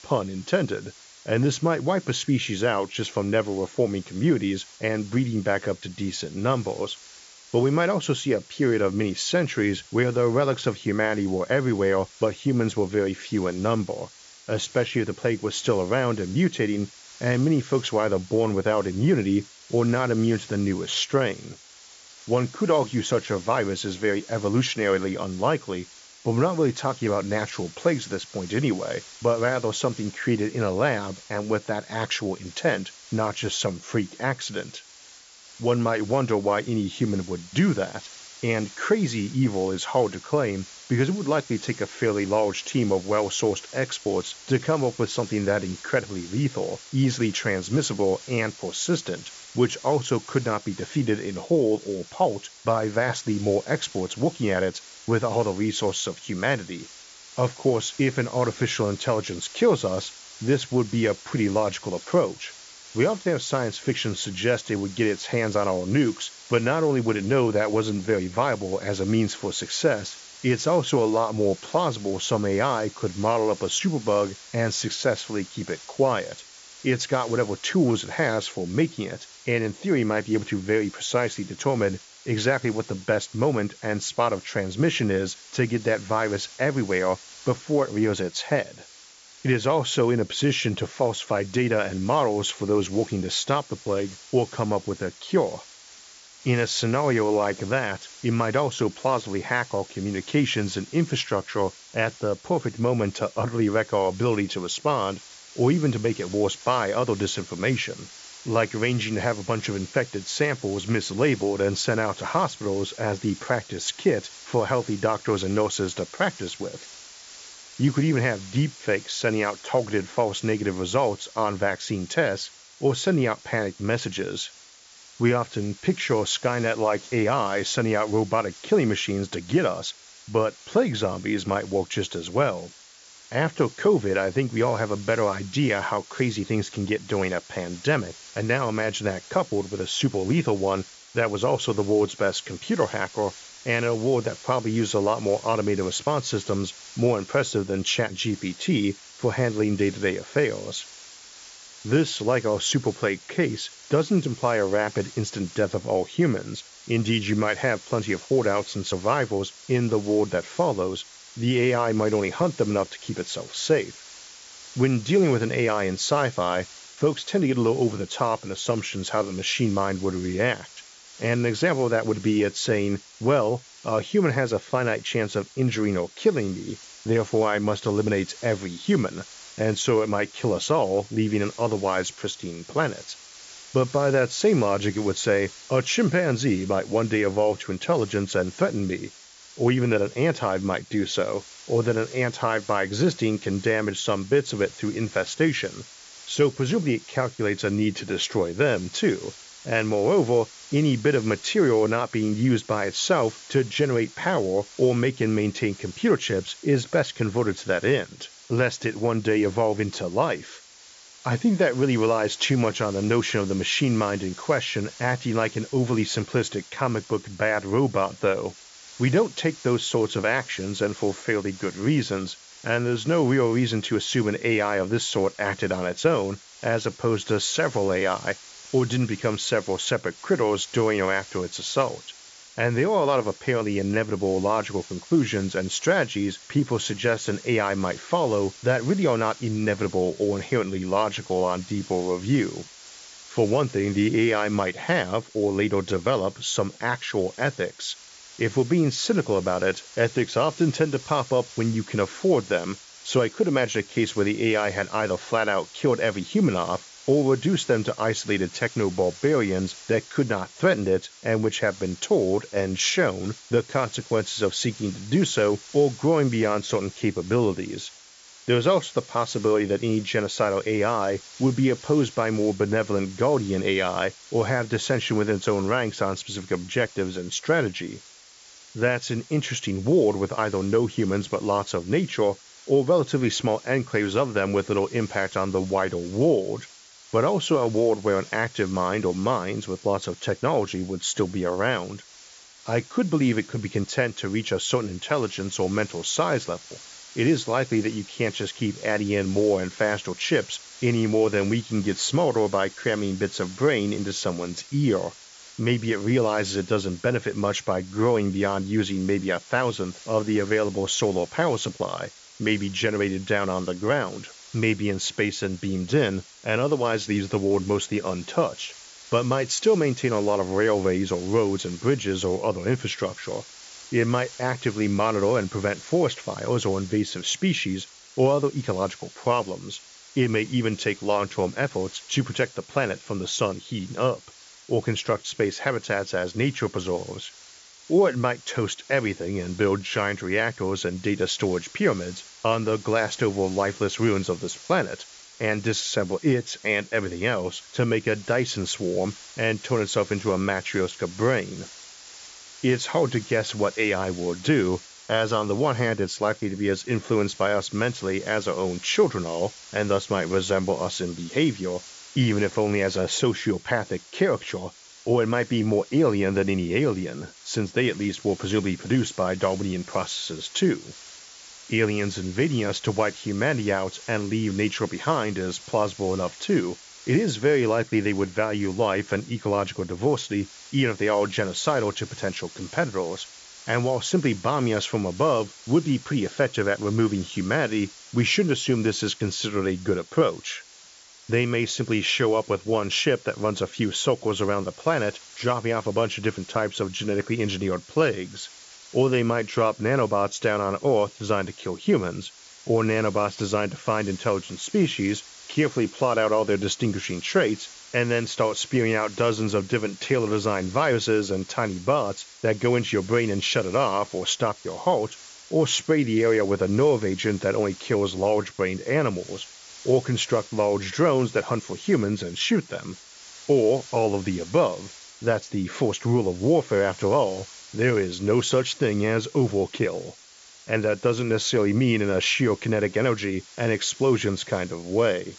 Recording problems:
high frequencies cut off; noticeable; nothing above 7.5 kHz
hiss; noticeable; throughout; 20 dB below the speech

